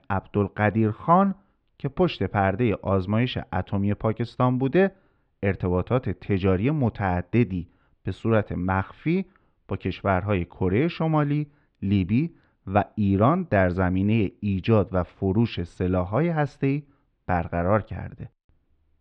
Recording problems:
muffled; slightly; fading above 3.5 kHz

